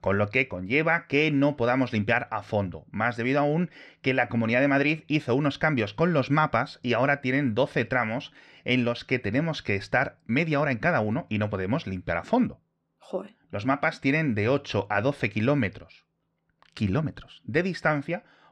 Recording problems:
muffled; very slightly; fading above 3.5 kHz

